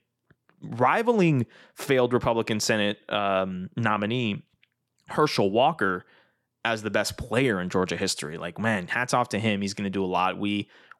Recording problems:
none

